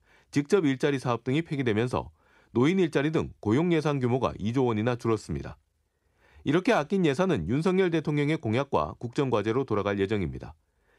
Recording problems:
none

